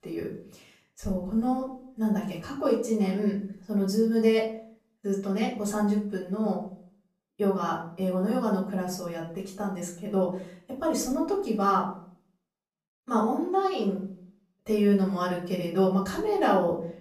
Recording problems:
off-mic speech; far
room echo; slight; dies away in 0.4 s

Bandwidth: 14.5 kHz